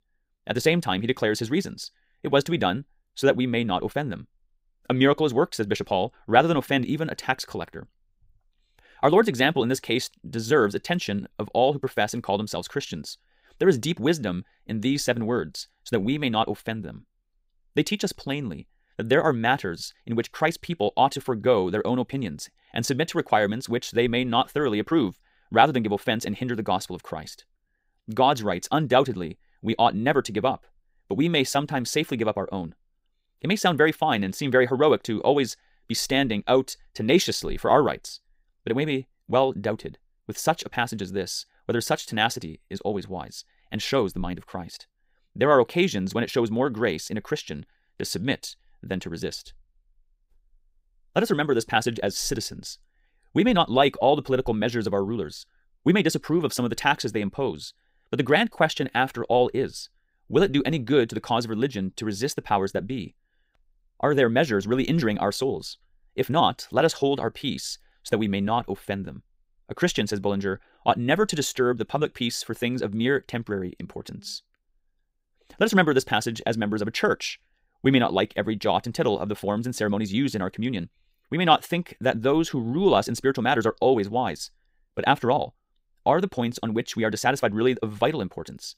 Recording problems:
wrong speed, natural pitch; too fast; 1.5 times normal speed

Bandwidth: 15.5 kHz